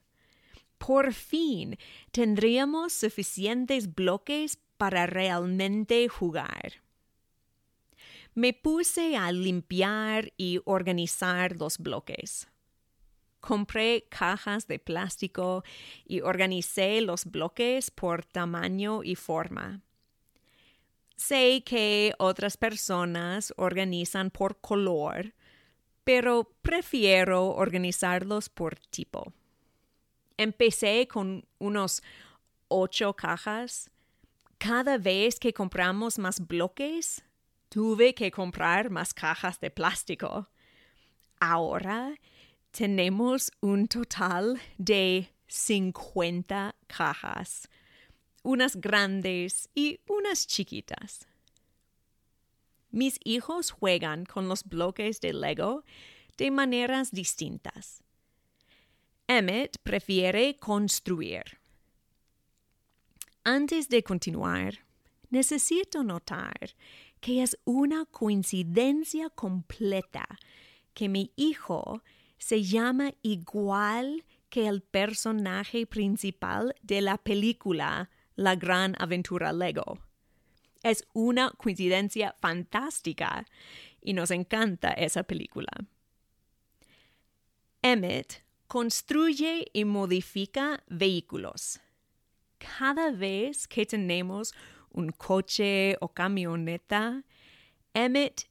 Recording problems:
none

